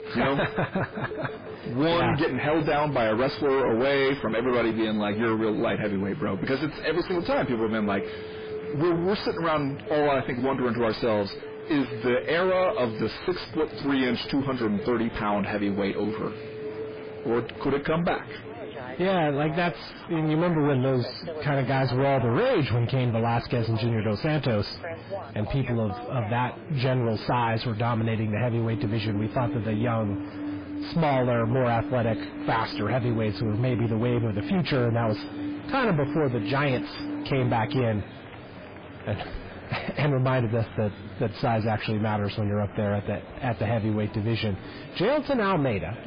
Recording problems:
distortion; heavy; 5 dB below the speech
garbled, watery; badly; nothing above 5 kHz
alarms or sirens; noticeable; throughout; 10 dB below the speech
murmuring crowd; noticeable; throughout; 15 dB below the speech

